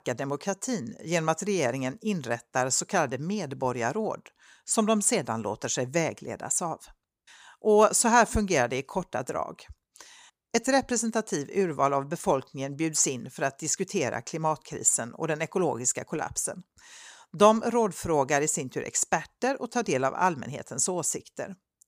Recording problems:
none

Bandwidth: 15 kHz